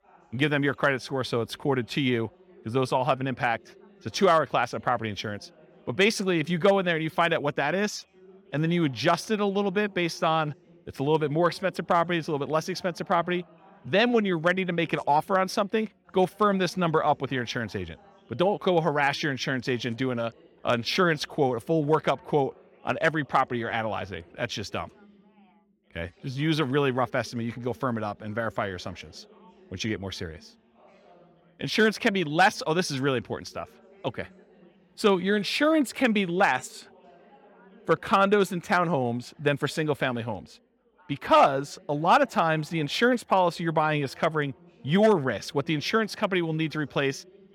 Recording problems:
background chatter; faint; throughout; 4 voices, 30 dB below the speech

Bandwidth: 17 kHz